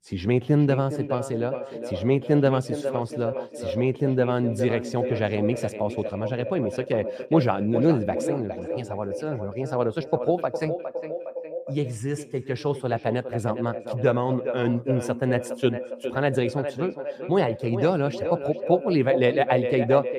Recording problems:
echo of what is said; strong; throughout; 410 ms later, 7 dB below the speech

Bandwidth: 14.5 kHz